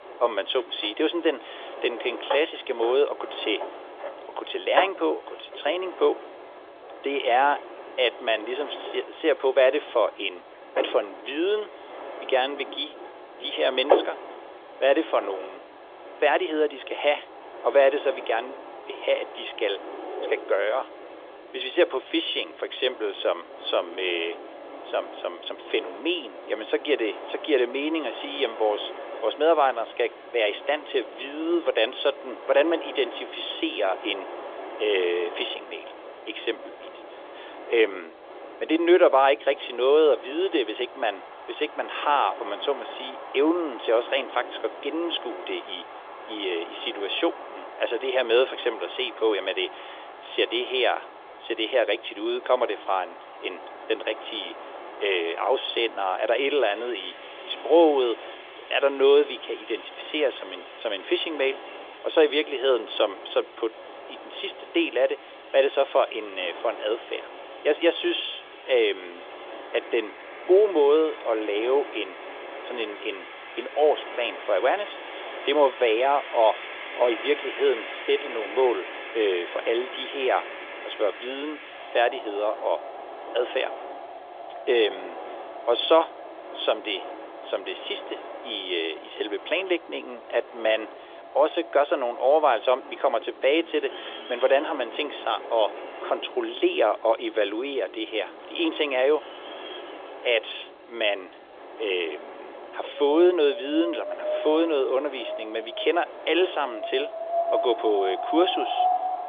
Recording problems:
phone-call audio; nothing above 3.5 kHz
wind in the background; noticeable; throughout; 10 dB below the speech

